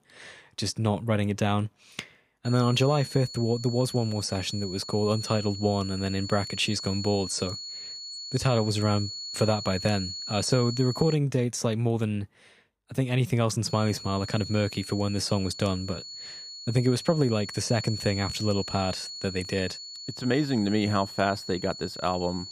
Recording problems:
high-pitched whine; loud; from 2.5 to 11 s and from 14 s on; 4.5 kHz, 9 dB below the speech

